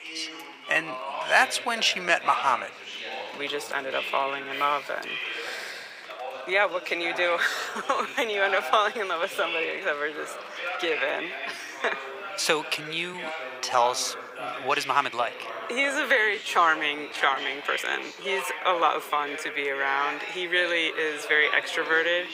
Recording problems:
thin; very; fading below 850 Hz
background chatter; loud; throughout; 2 voices, 9 dB below the speech
rain or running water; faint; throughout; 25 dB below the speech
uneven, jittery; strongly; from 0.5 to 20 s

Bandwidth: 15.5 kHz